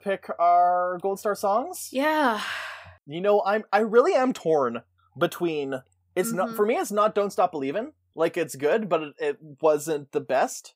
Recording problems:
none

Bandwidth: 15.5 kHz